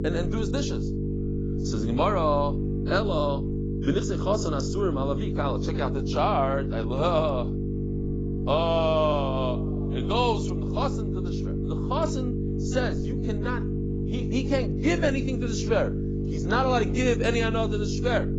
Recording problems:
garbled, watery; badly; nothing above 7.5 kHz
electrical hum; loud; throughout; 50 Hz, 8 dB below the speech

